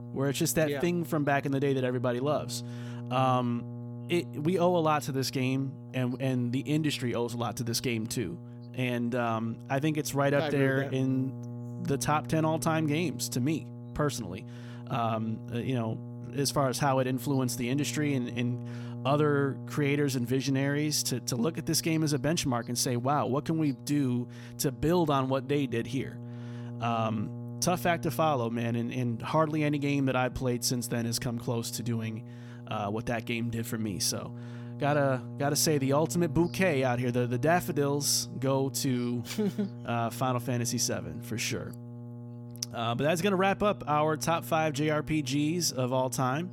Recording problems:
electrical hum; noticeable; throughout; 60 Hz, 20 dB below the speech

